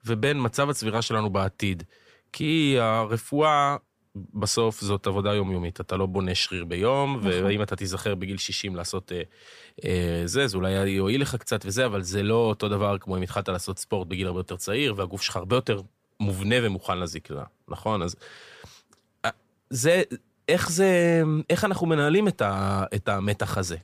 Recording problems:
none

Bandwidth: 15 kHz